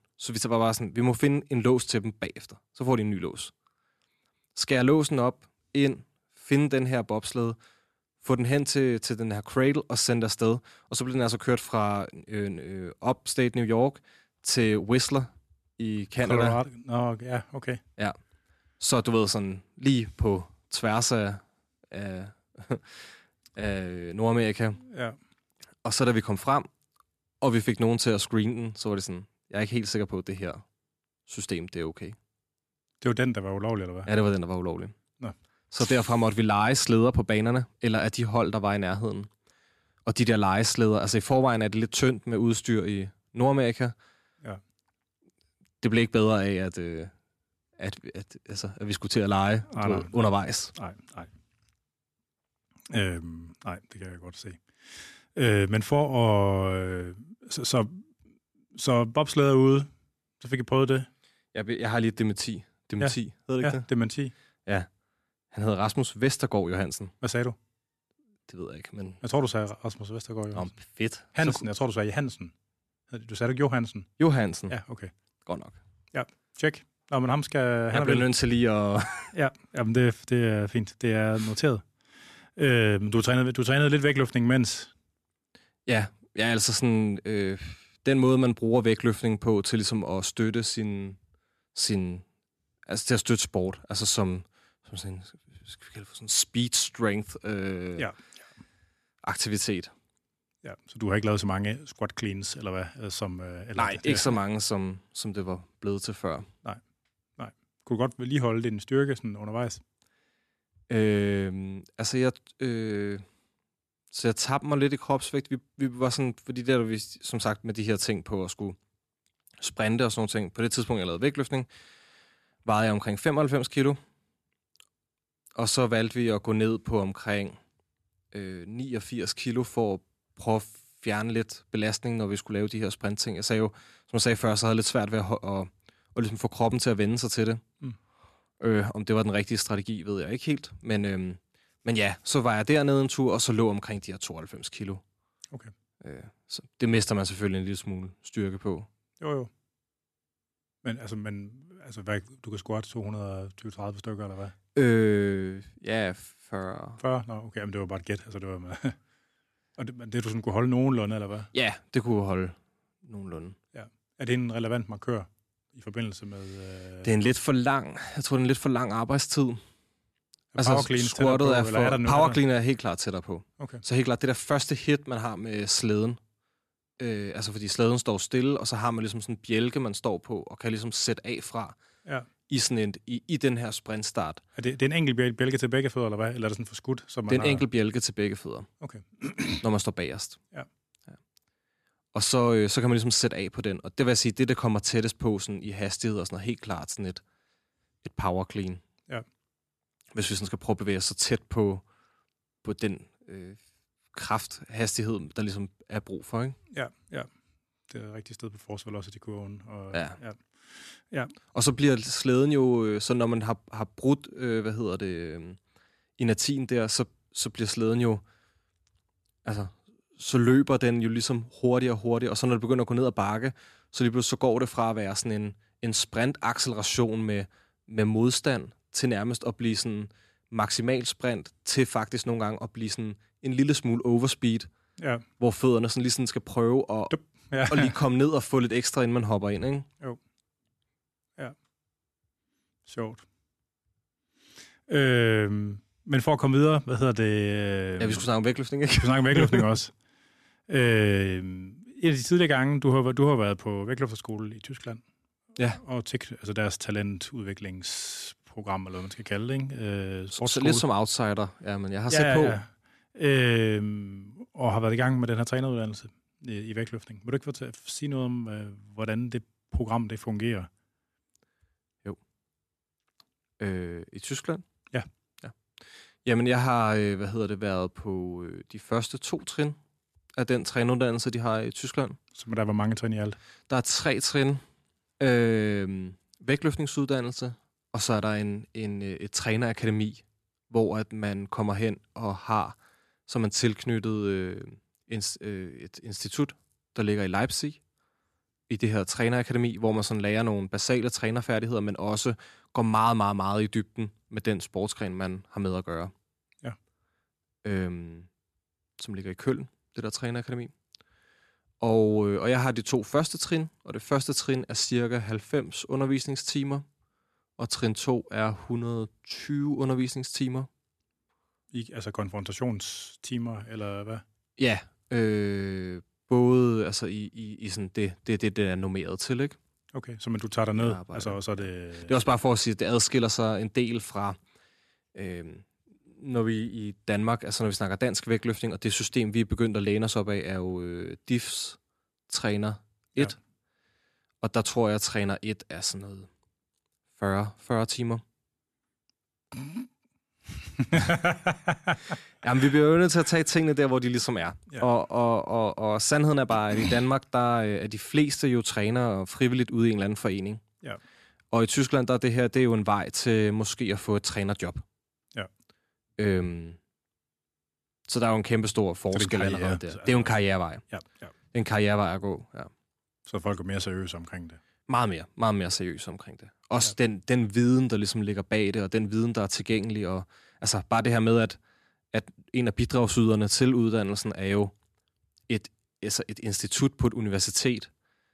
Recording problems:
none

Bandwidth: 13.5 kHz